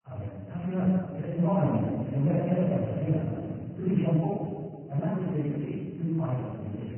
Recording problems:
room echo; strong; dies away in 1.6 s
off-mic speech; far
garbled, watery; badly
high frequencies cut off; severe; nothing above 3 kHz
wrong speed, natural pitch; too fast; 1.7 times normal speed

